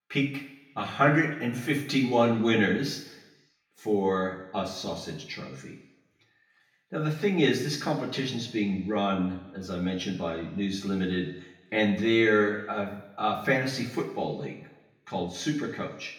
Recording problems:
off-mic speech; far
room echo; noticeable; dies away in 1 s

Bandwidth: 18 kHz